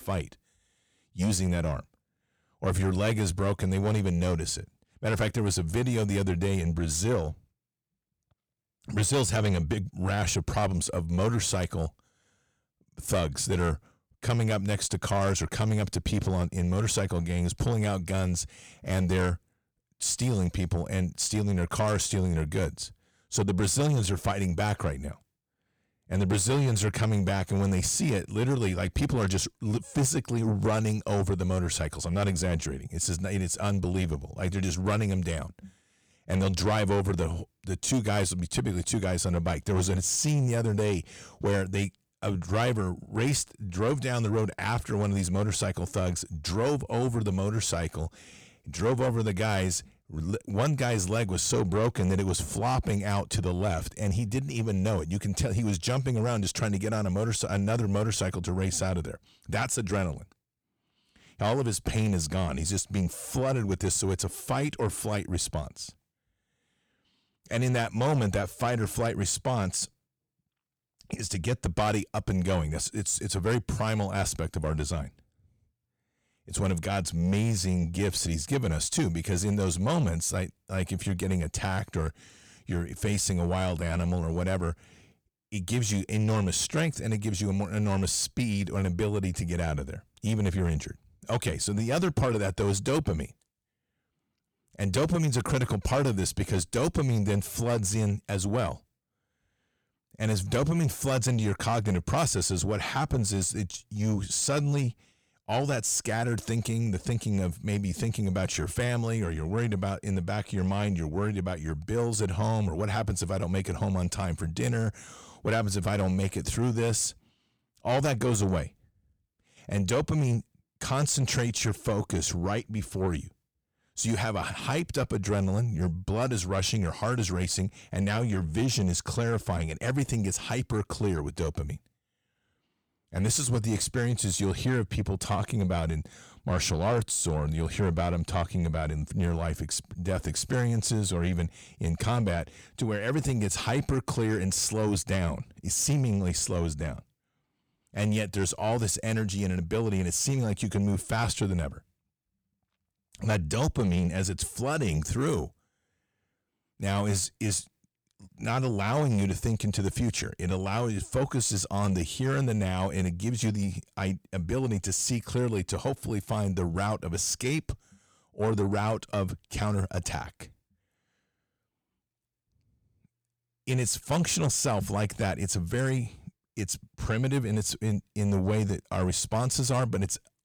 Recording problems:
distortion; slight; 10 dB below the speech

